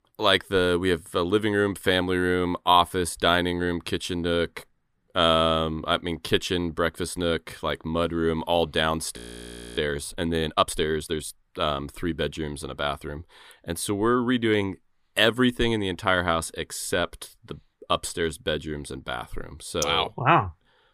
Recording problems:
audio freezing; at 9 s for 0.5 s

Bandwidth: 15 kHz